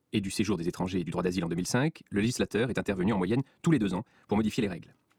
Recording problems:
wrong speed, natural pitch; too fast; 1.5 times normal speed

